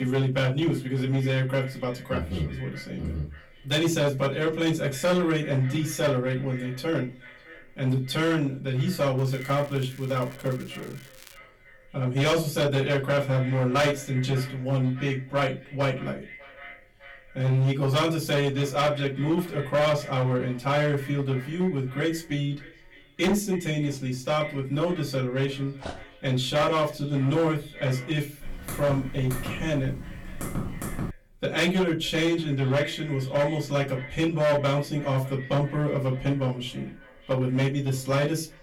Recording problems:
off-mic speech; far
echo of what is said; faint; throughout; 600 ms later, 20 dB below the speech
distortion; slight; 7% of the sound clipped
room echo; very slight; dies away in 0.2 s
crackling; faint; from 9 to 11 s; 25 dB below the speech
abrupt cut into speech; at the start
dog barking; faint; at 26 s; peak 15 dB below the speech
keyboard typing; noticeable; from 28 to 31 s; peak 7 dB below the speech

